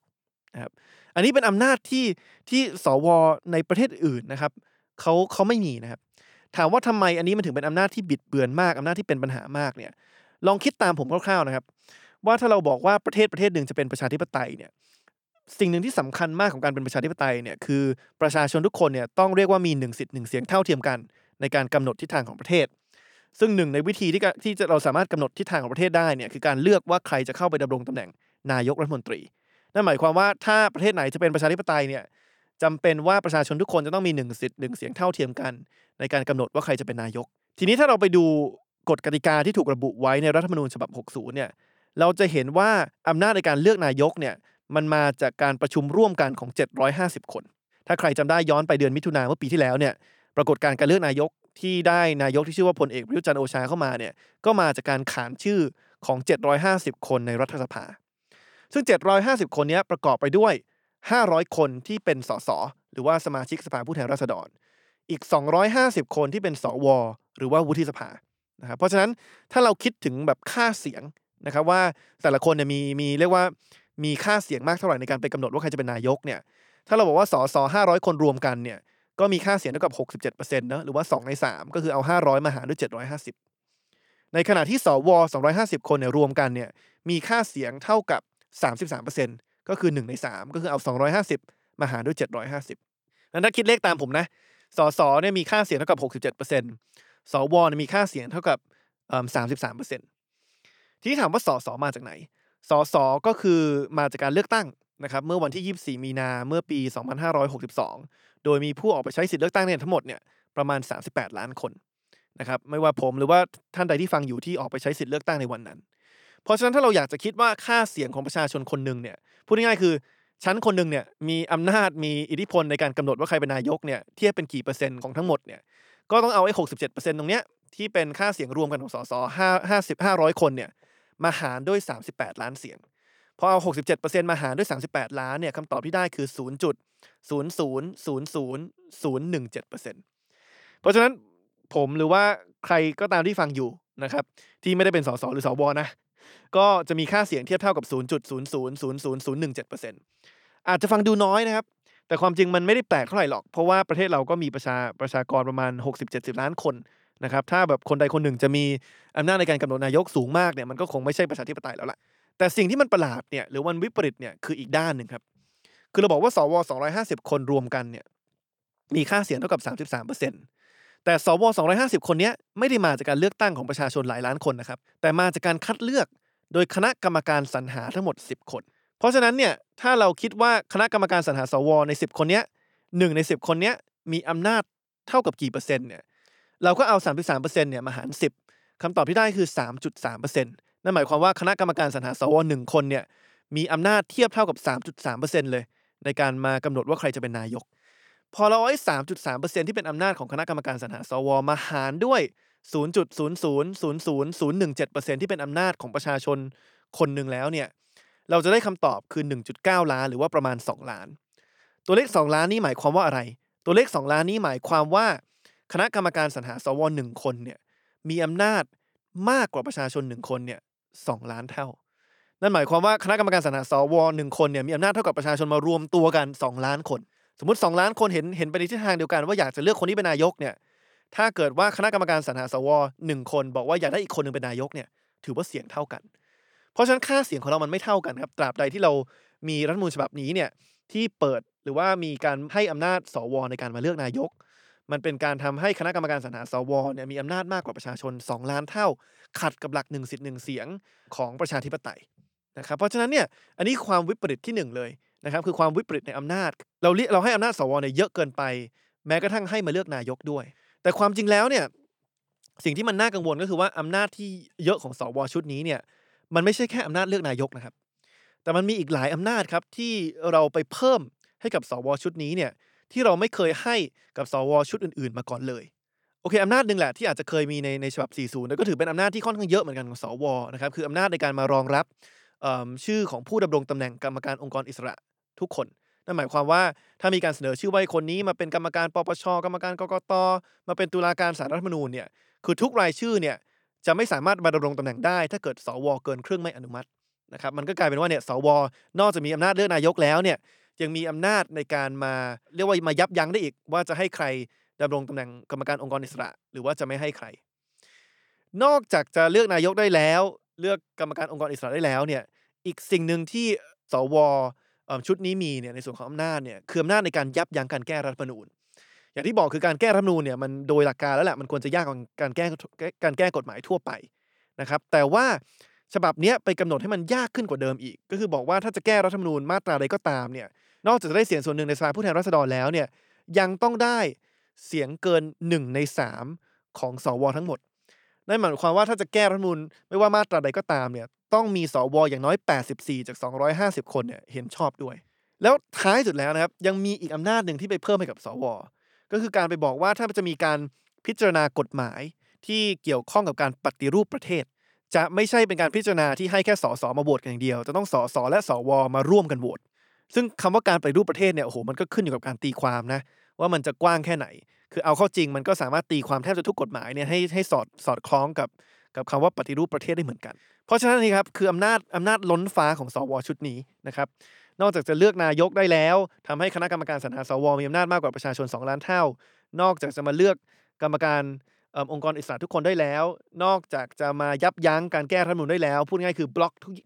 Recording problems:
none

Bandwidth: 18.5 kHz